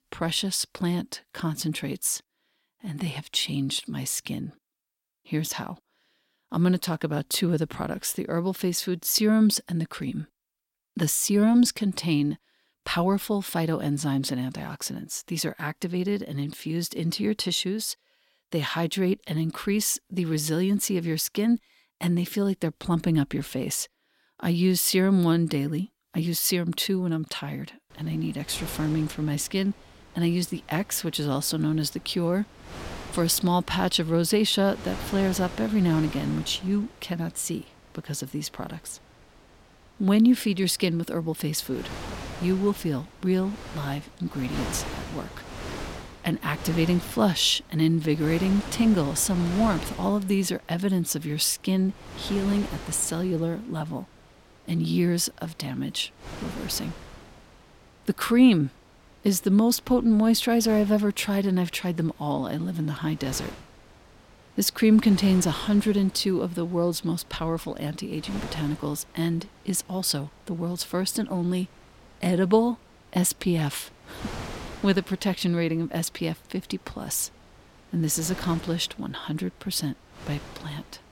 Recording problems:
wind noise on the microphone; occasional gusts; from 28 s on; 10 dB below the speech

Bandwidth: 16.5 kHz